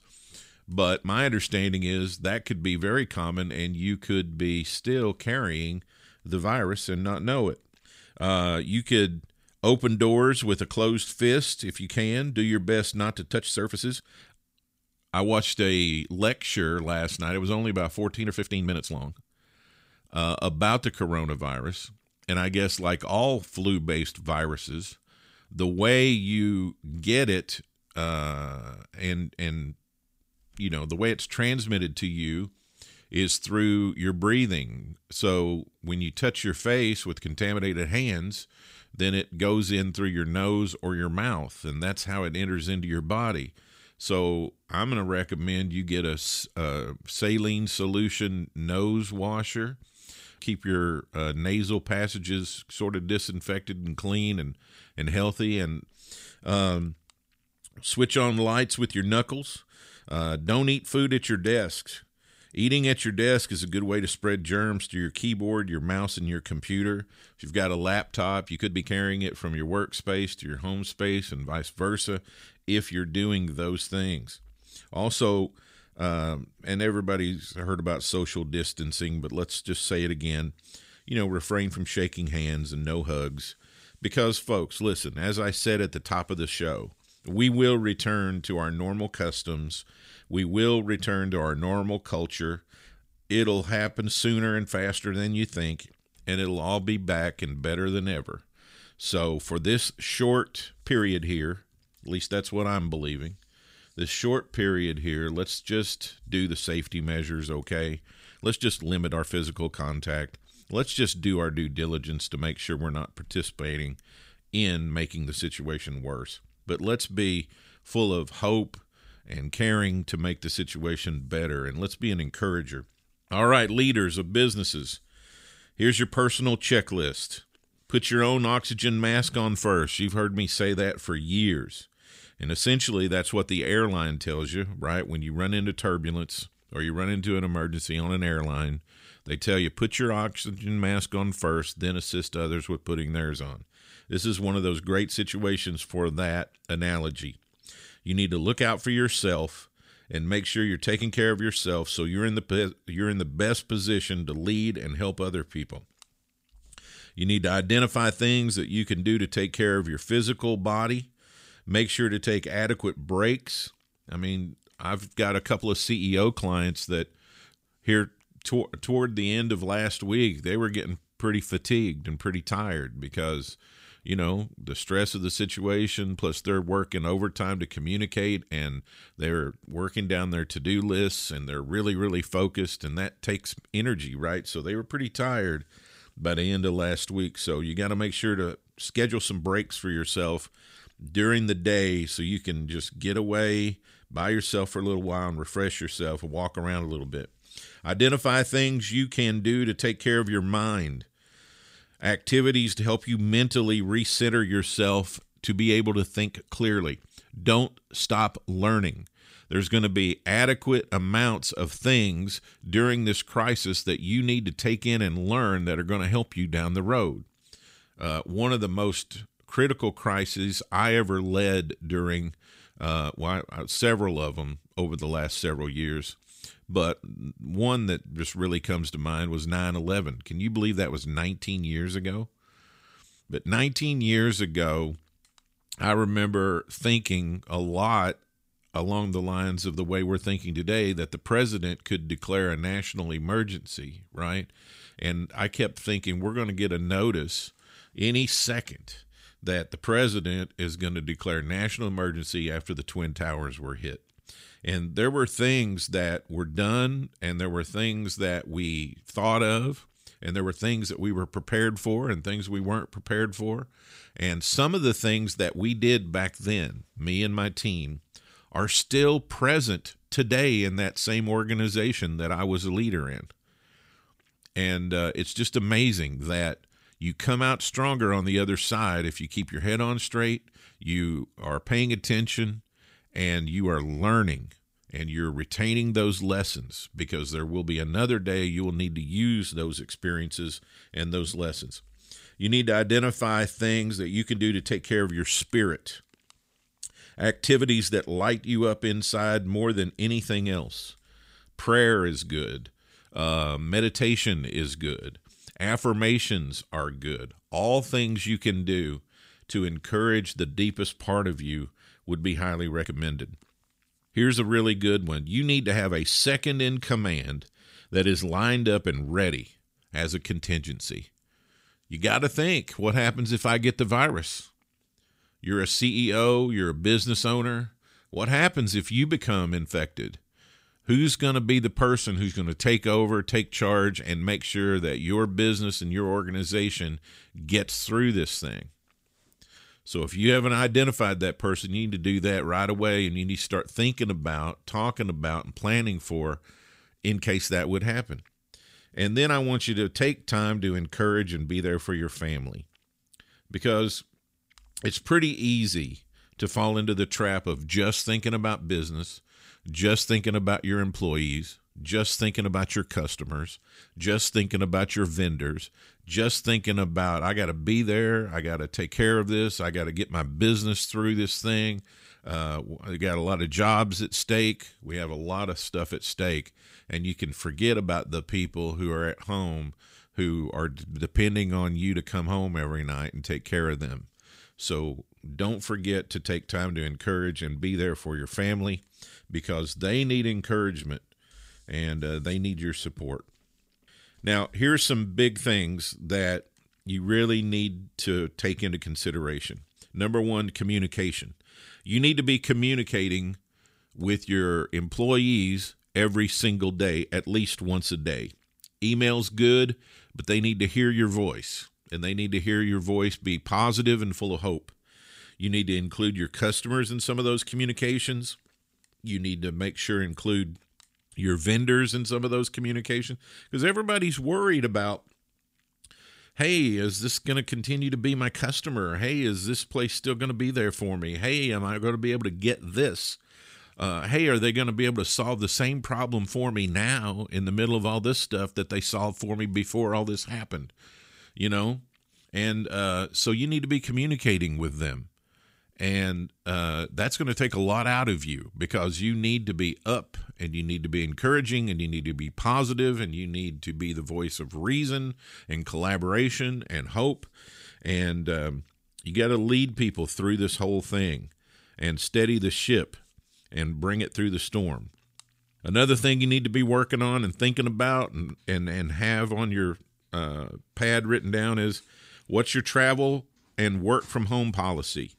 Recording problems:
uneven, jittery; strongly; from 13 s to 7:53

